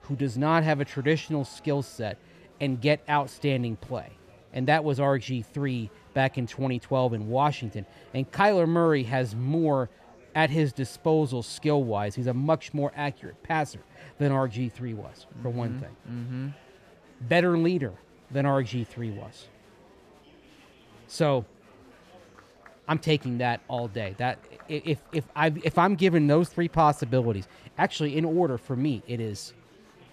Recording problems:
murmuring crowd; faint; throughout; 25 dB below the speech

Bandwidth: 14.5 kHz